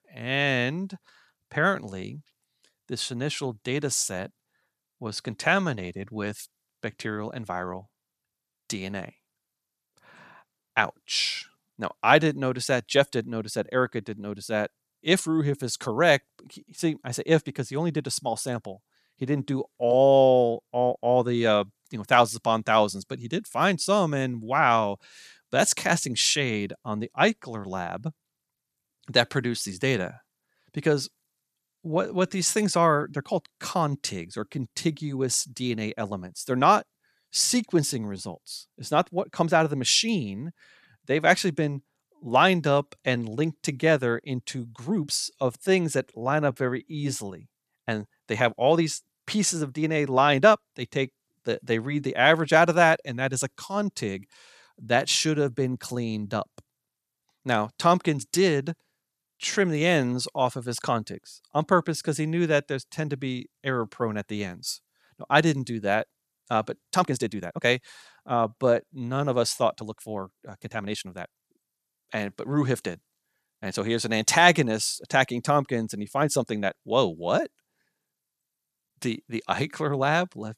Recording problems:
uneven, jittery; strongly; from 7 s to 1:17

